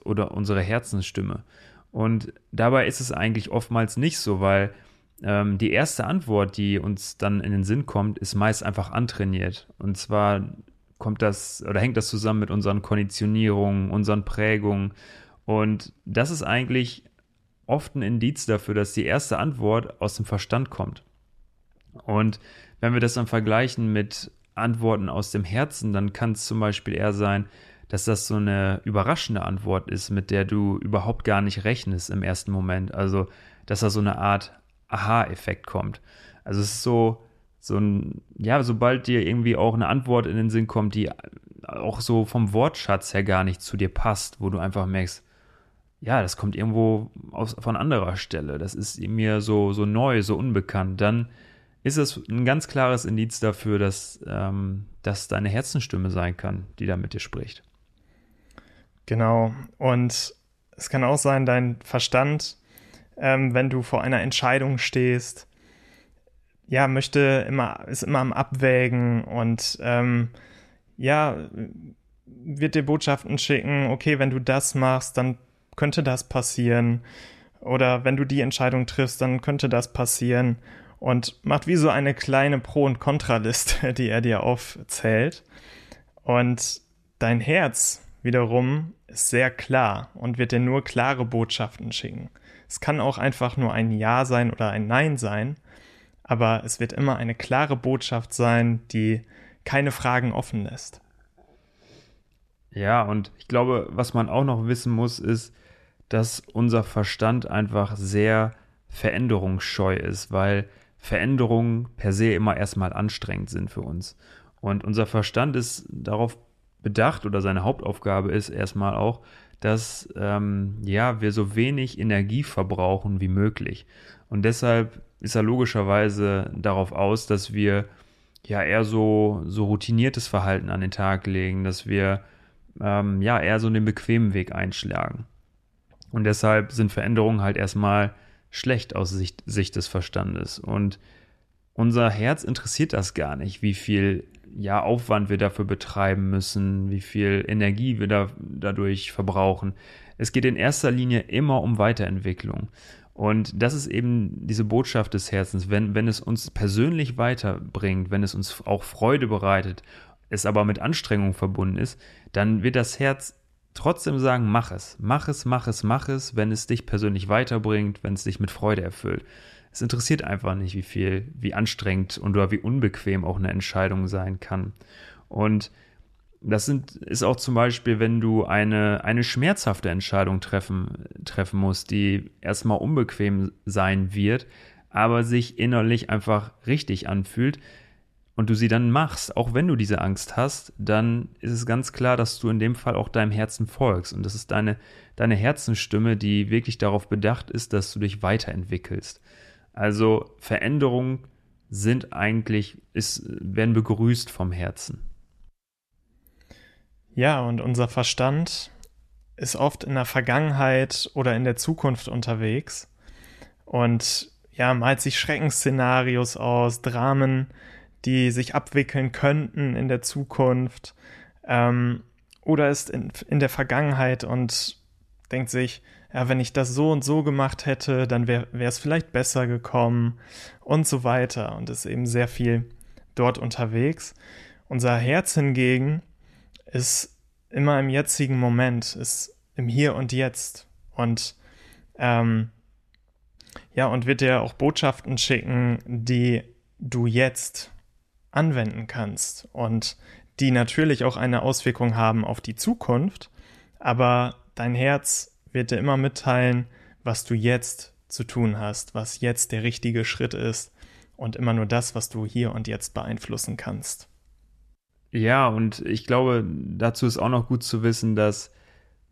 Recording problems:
none

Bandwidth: 13.5 kHz